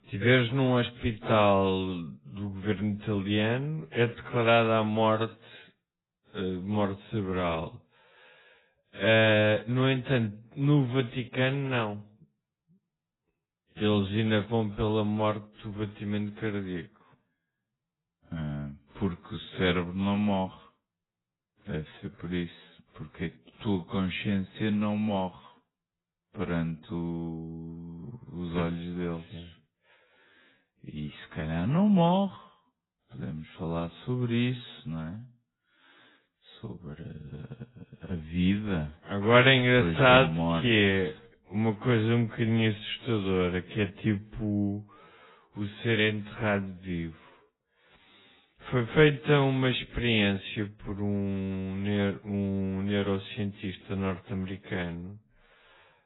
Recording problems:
garbled, watery; badly; nothing above 4 kHz
wrong speed, natural pitch; too slow; 0.5 times normal speed

